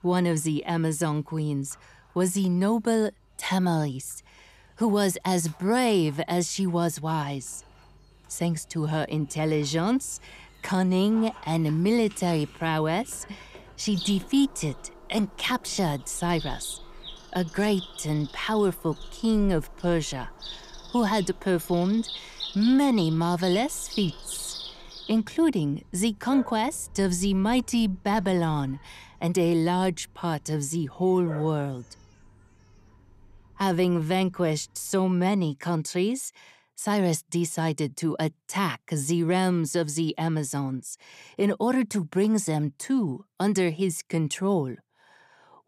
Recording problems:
animal sounds; noticeable; until 35 s; 15 dB below the speech

